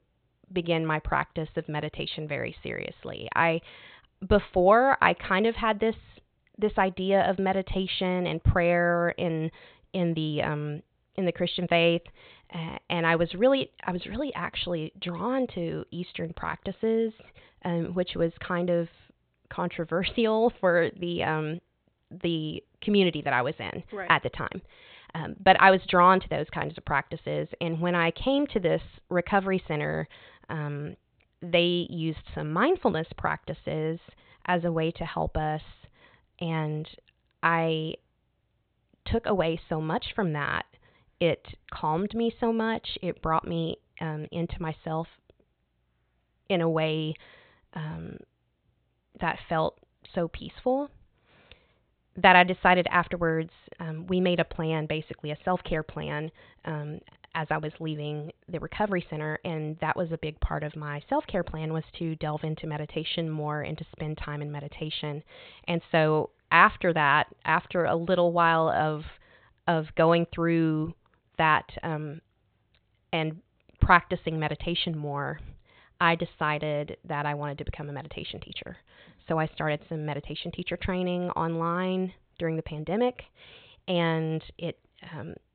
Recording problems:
high frequencies cut off; severe; nothing above 4 kHz

